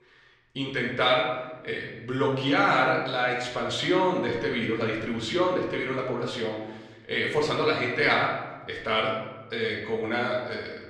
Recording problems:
off-mic speech; far
room echo; noticeable; dies away in 1 s

